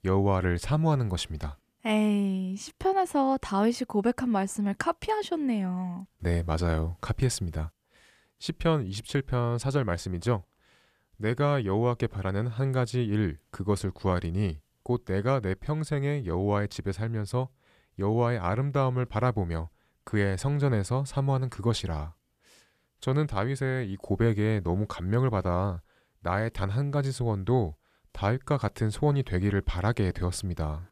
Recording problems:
none

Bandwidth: 14.5 kHz